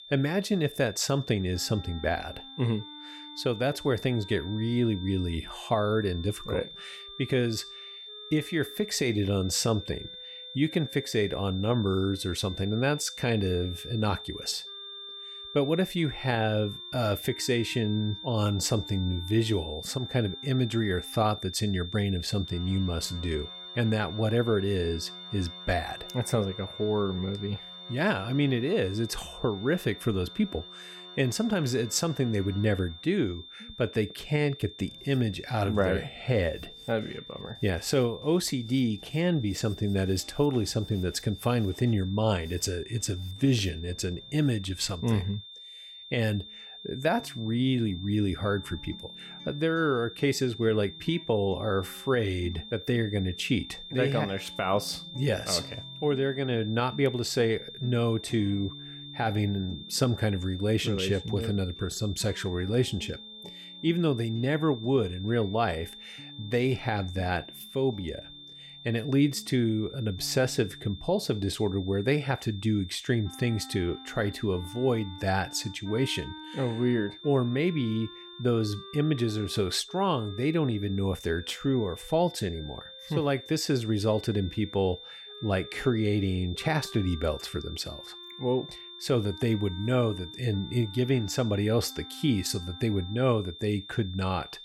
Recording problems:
high-pitched whine; noticeable; throughout; 3.5 kHz, 15 dB below the speech
background music; faint; throughout; 25 dB below the speech

